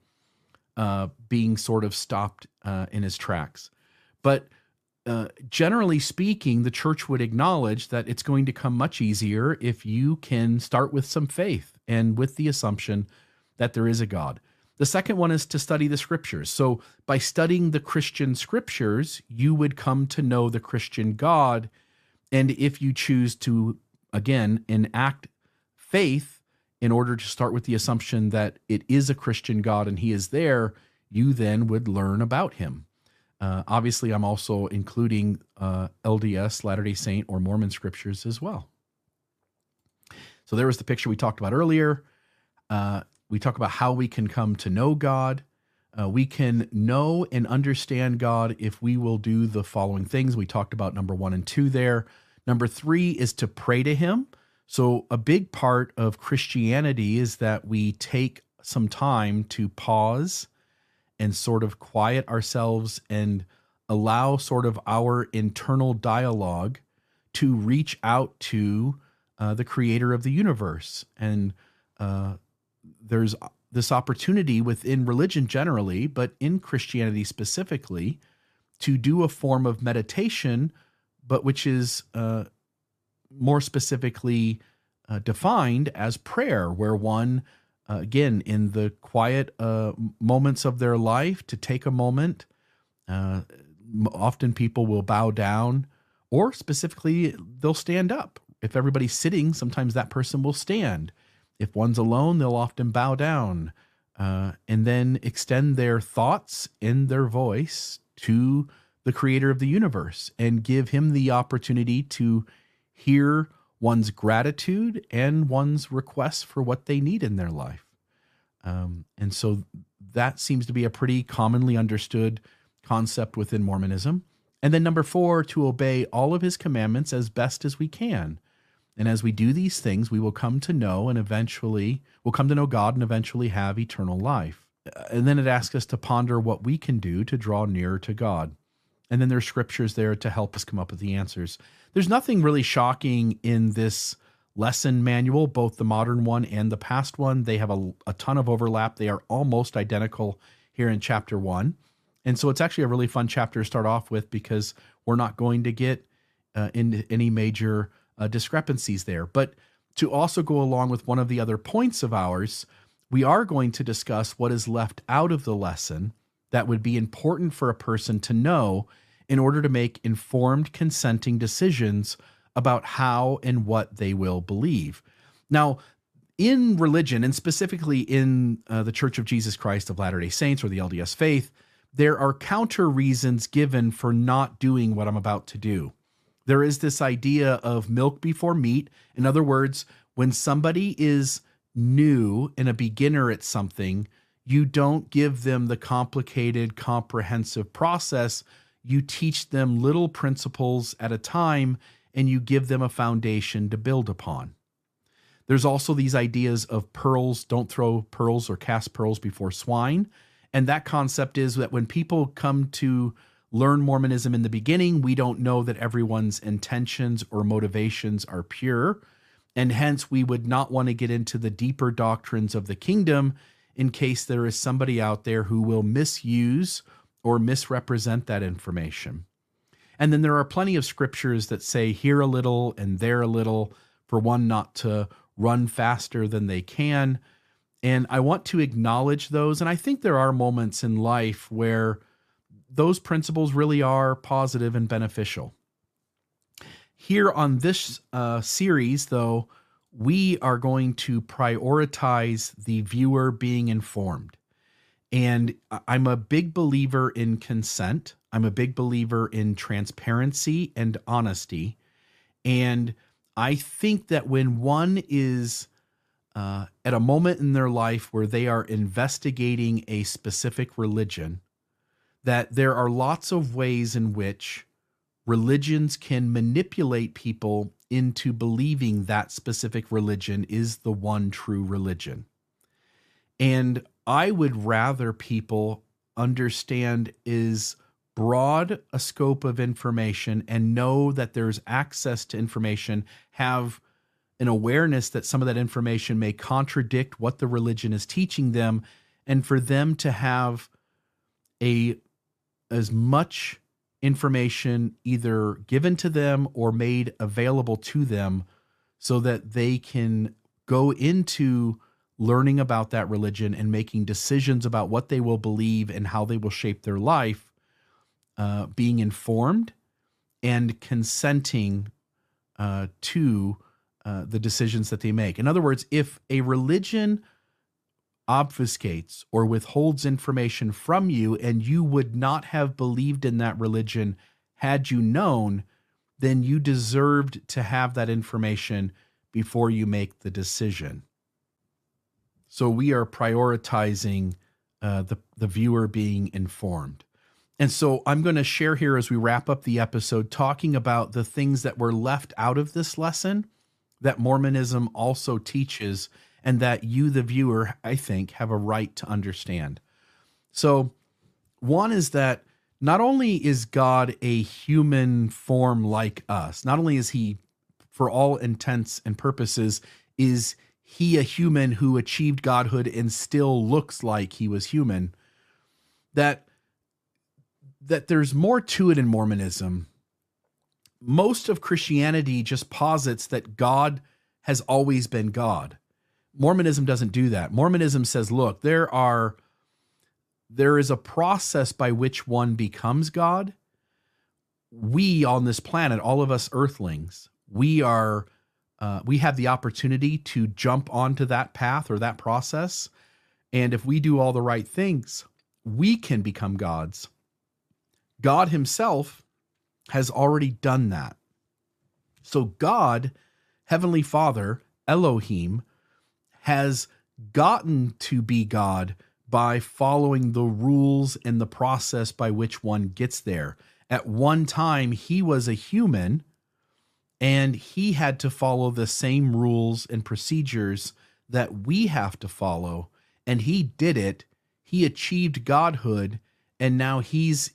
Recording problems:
none

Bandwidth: 14.5 kHz